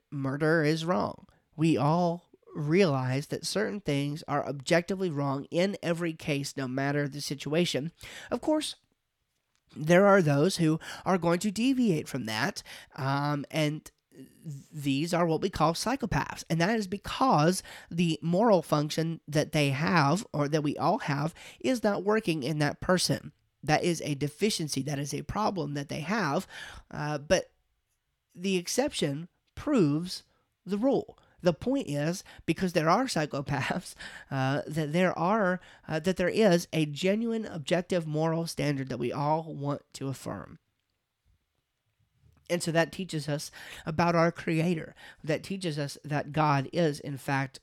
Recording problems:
none

